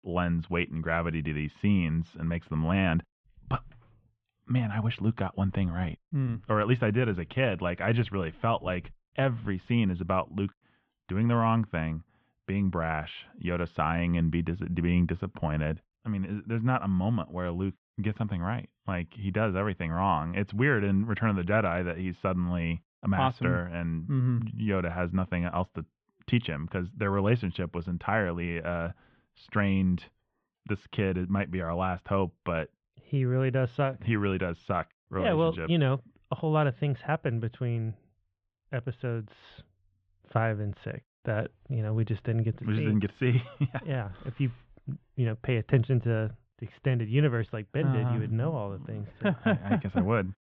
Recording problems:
muffled; very; fading above 3.5 kHz

